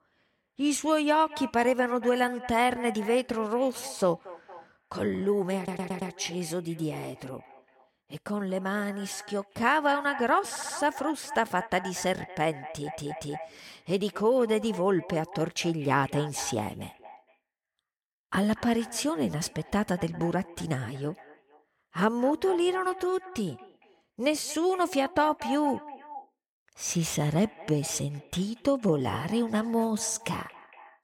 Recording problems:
echo of what is said; noticeable; throughout; 230 ms later, 15 dB below the speech
audio stuttering; at 5.5 s, at 11 s and at 13 s

